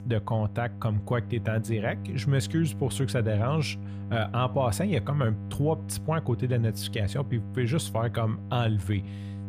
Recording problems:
electrical hum; noticeable; throughout; 50 Hz, 15 dB below the speech

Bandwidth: 15 kHz